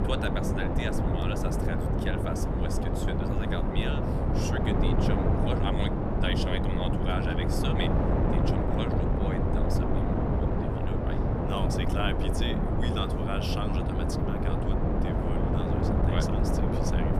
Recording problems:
wind noise on the microphone; heavy; 4 dB above the speech

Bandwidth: 14 kHz